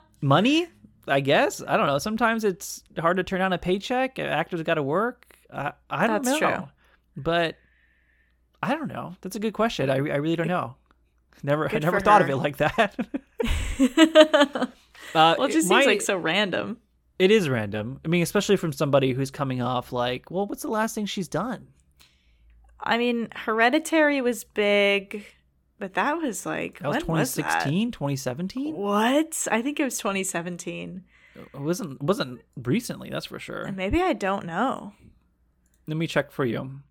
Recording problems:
none

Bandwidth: 17.5 kHz